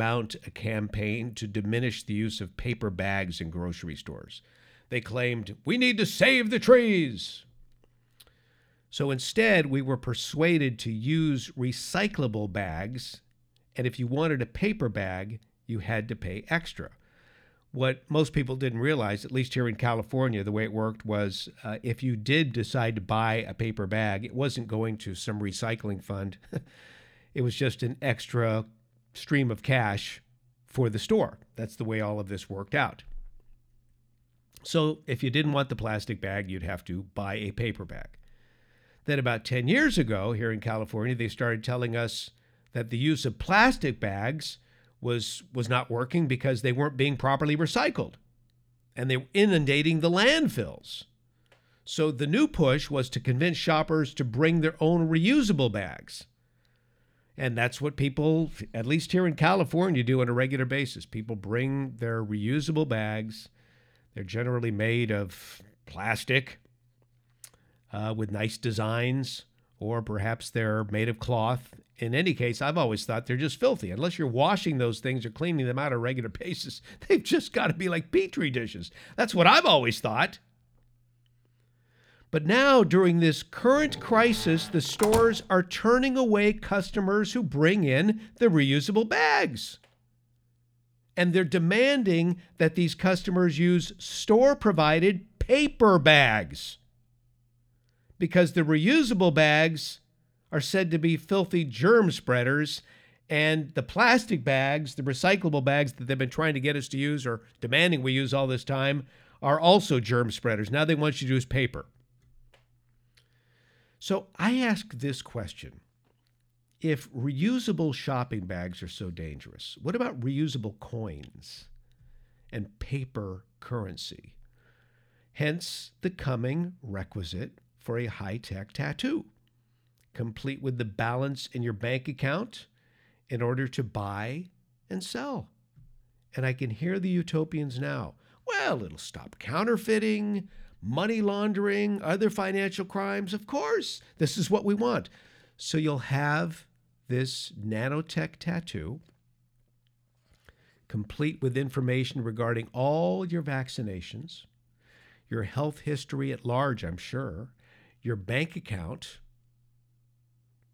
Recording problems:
abrupt cut into speech; at the start
door banging; noticeable; from 1:24 to 1:25; peak 4 dB below the speech

